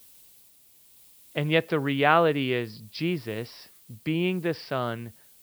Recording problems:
high frequencies cut off; noticeable; nothing above 5.5 kHz
hiss; faint; throughout; 25 dB below the speech

